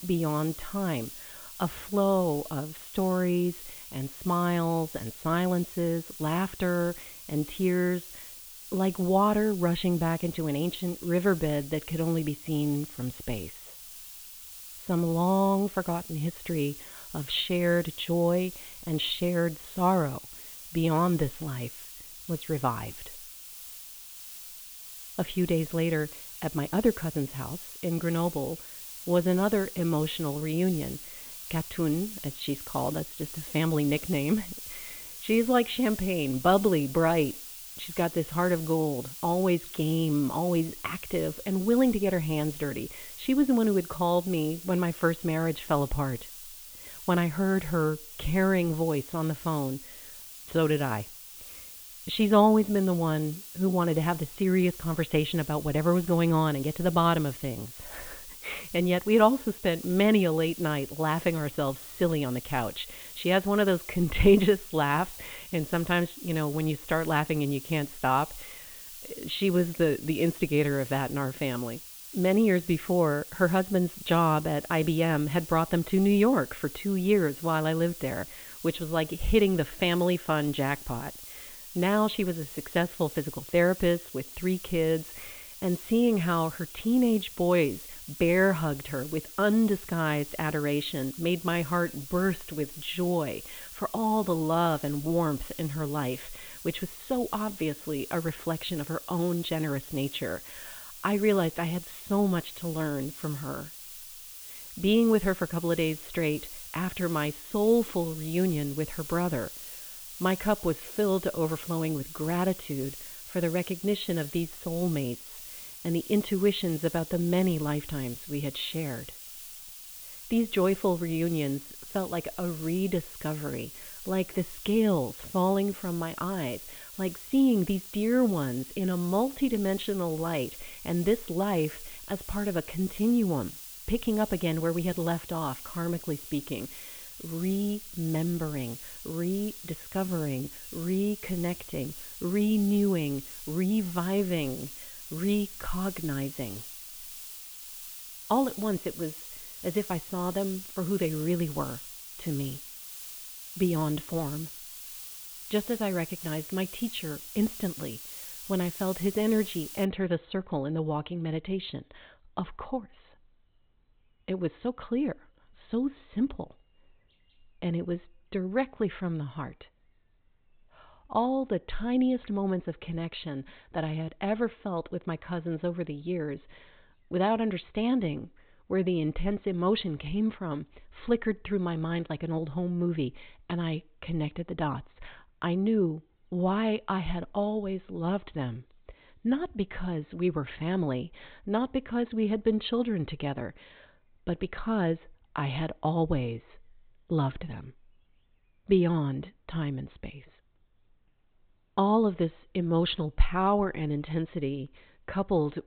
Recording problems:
high frequencies cut off; severe; nothing above 4 kHz
hiss; noticeable; until 2:40; 10 dB below the speech

